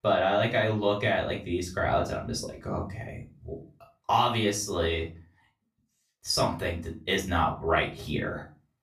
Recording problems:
off-mic speech; far
room echo; slight; dies away in 0.3 s

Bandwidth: 14.5 kHz